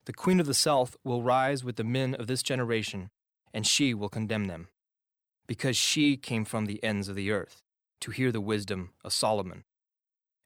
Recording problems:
none

